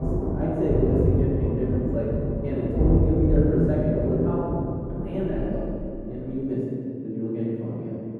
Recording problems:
room echo; strong; dies away in 2.7 s
off-mic speech; far
muffled; very; fading above 1.5 kHz
rain or running water; very loud; until 6 s; 1 dB above the speech

